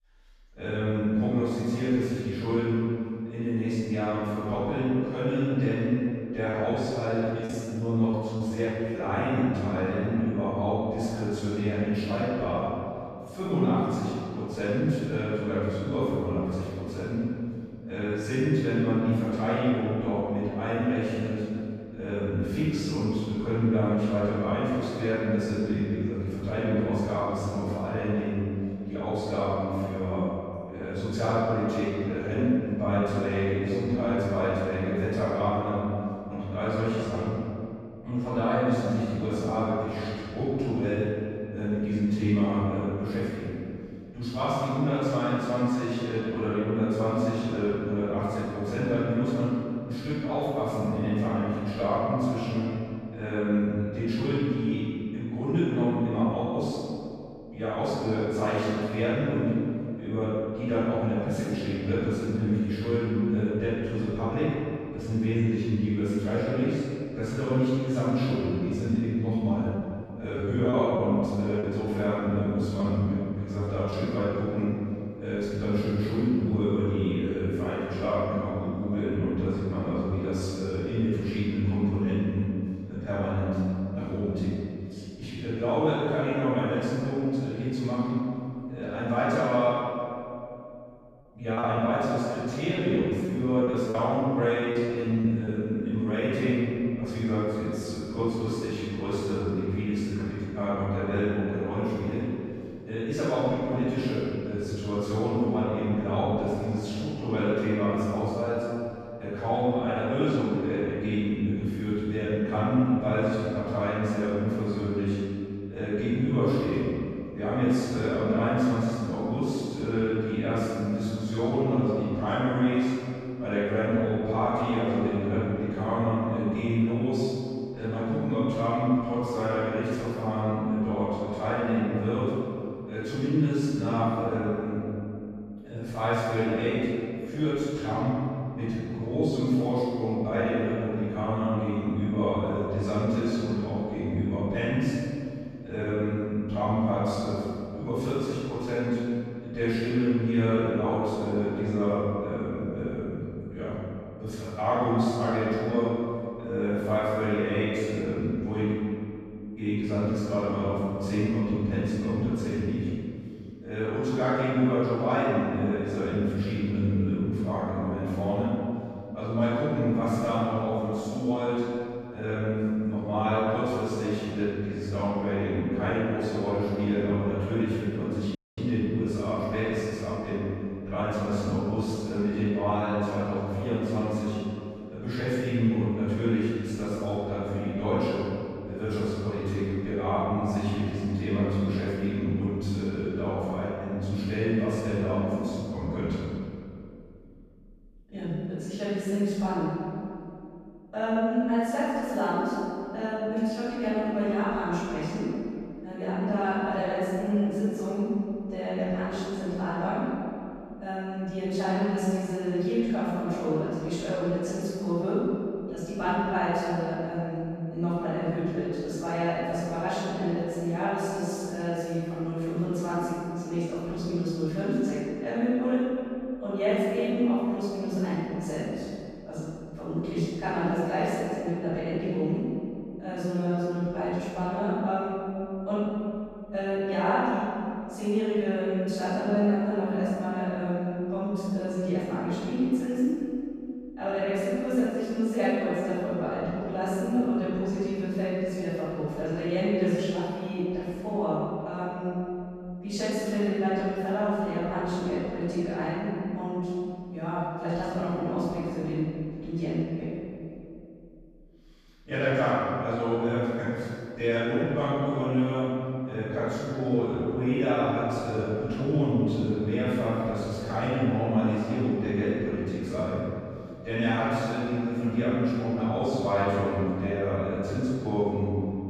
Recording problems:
room echo; strong; dies away in 2.4 s
off-mic speech; far
choppy; very; from 6.5 to 9 s, from 1:10 to 1:14 and from 1:32 to 1:36; 9% of the speech affected
audio cutting out; at 2:58

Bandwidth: 14.5 kHz